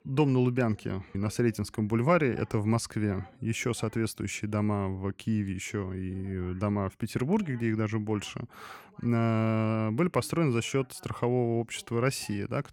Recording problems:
voice in the background; faint; throughout; 30 dB below the speech

